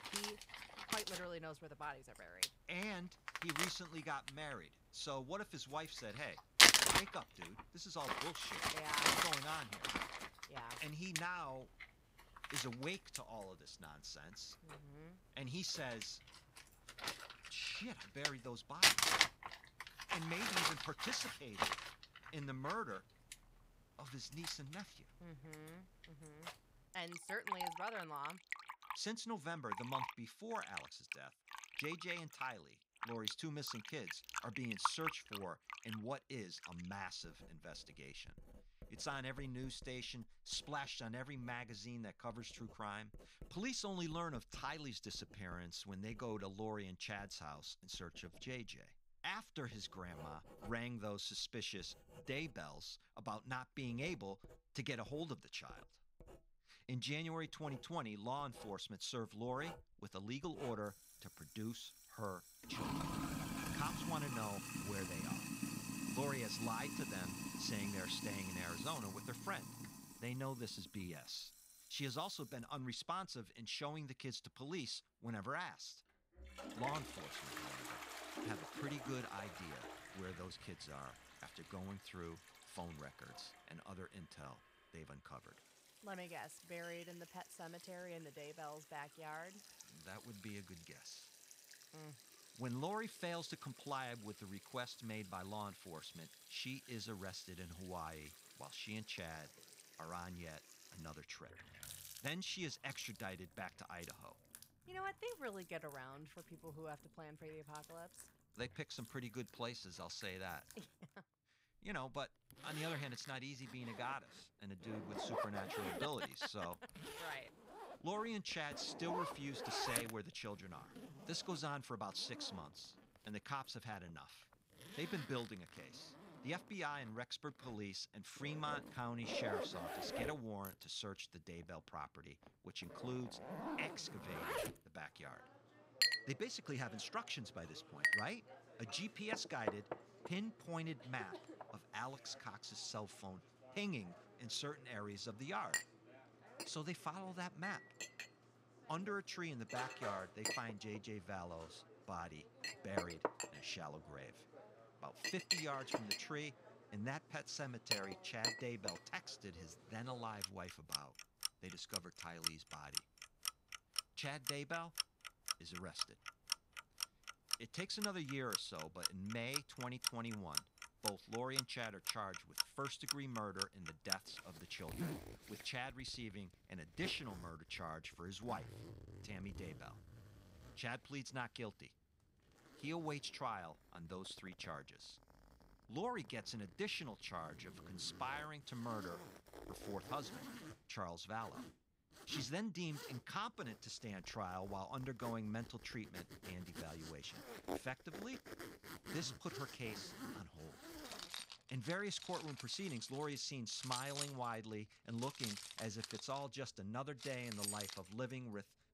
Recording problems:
household noises; very loud; throughout; 5 dB above the speech

